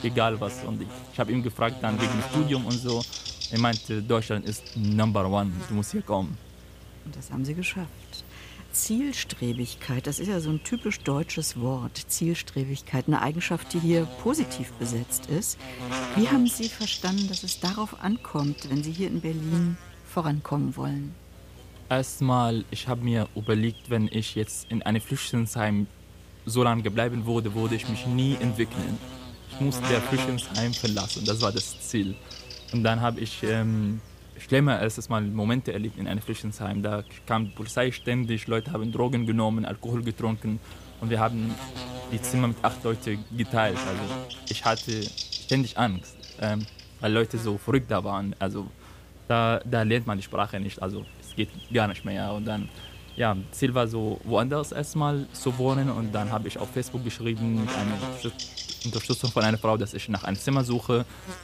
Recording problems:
electrical hum; loud; throughout; 60 Hz, 7 dB below the speech

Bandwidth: 15 kHz